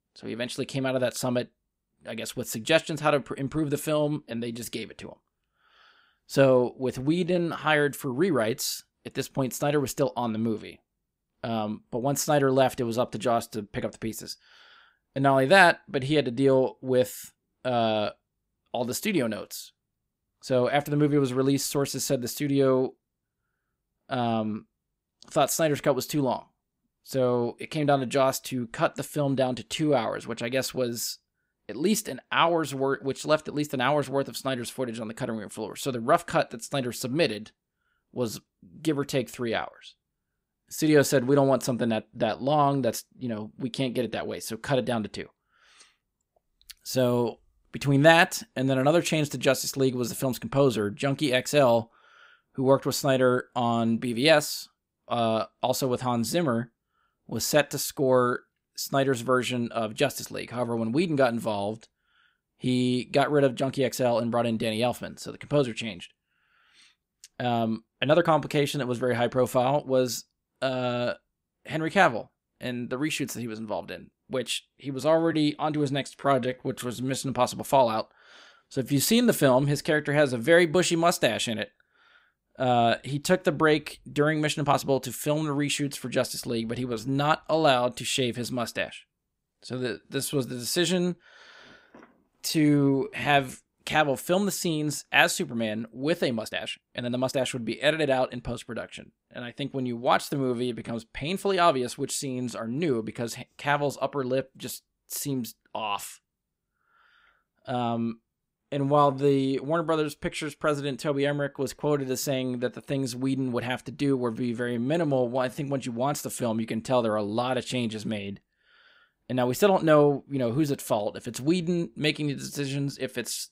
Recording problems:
uneven, jittery; strongly; from 7 s to 1:56

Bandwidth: 15.5 kHz